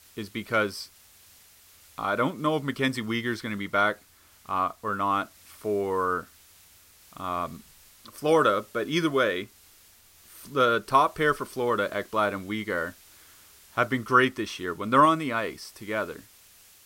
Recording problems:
hiss; faint; throughout; 25 dB below the speech

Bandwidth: 16 kHz